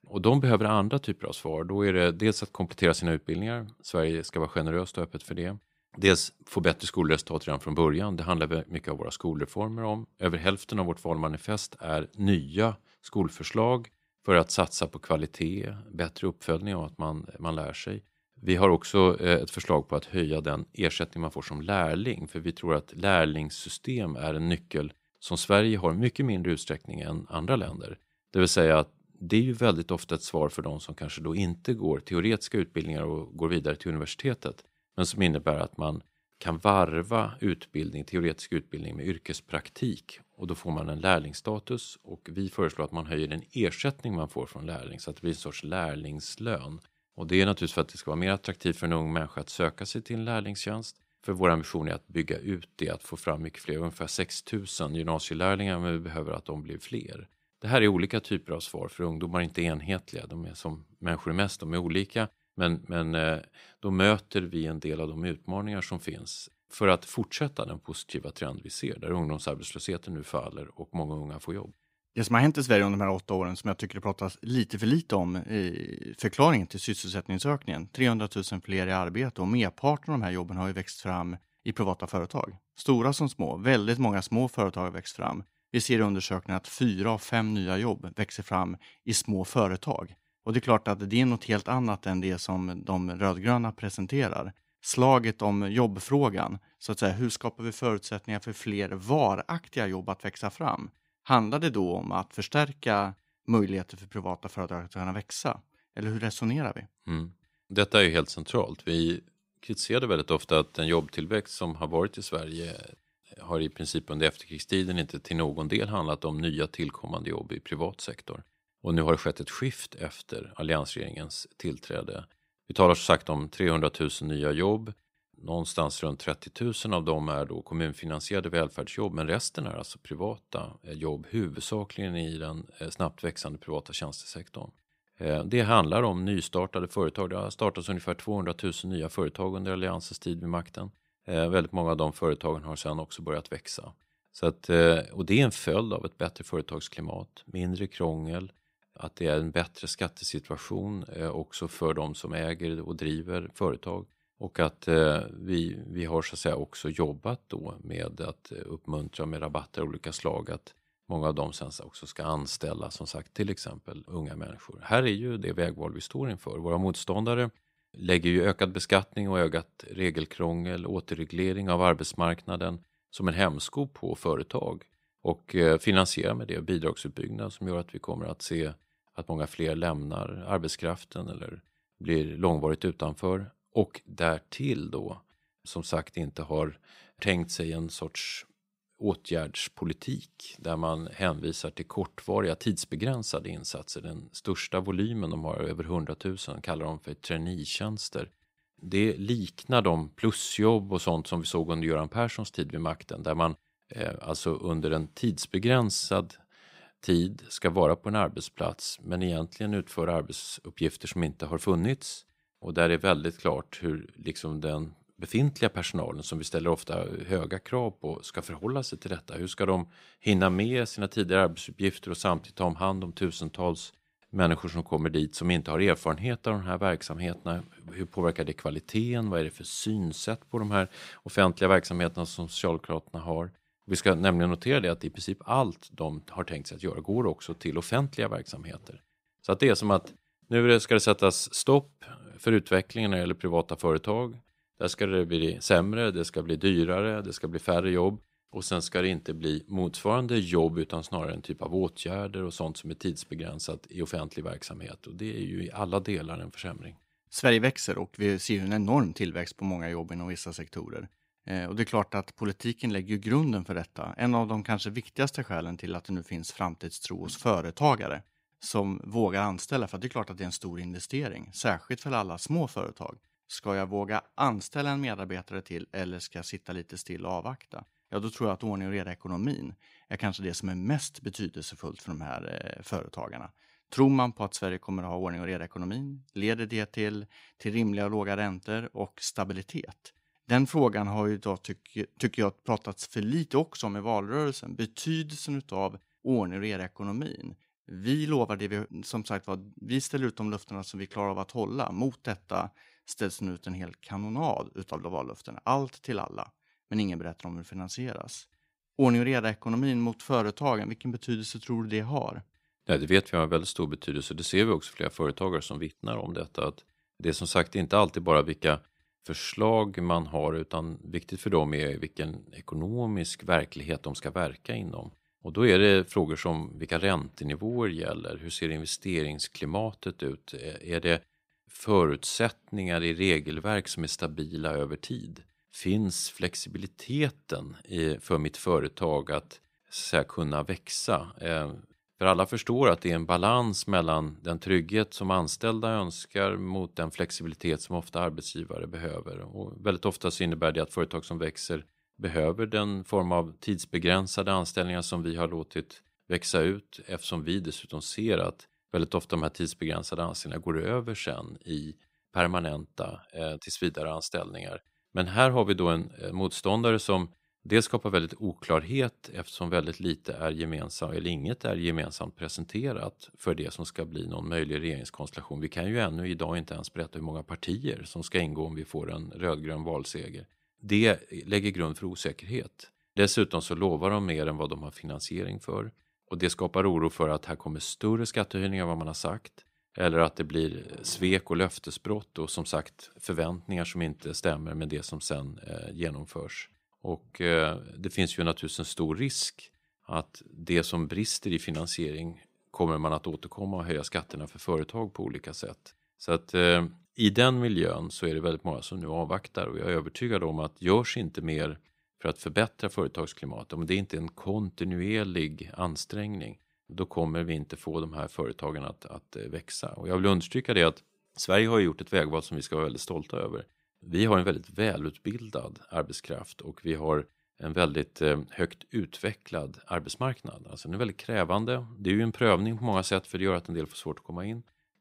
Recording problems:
none

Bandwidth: 15.5 kHz